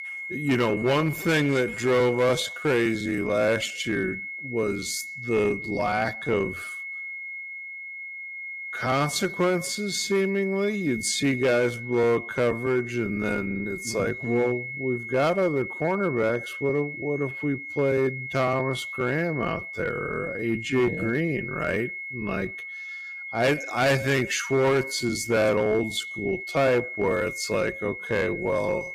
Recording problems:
wrong speed, natural pitch; too slow; 0.5 times normal speed
distortion; slight; 5% of the sound clipped
high-pitched whine; loud; throughout; 2 kHz, 8 dB below the speech

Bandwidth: 14.5 kHz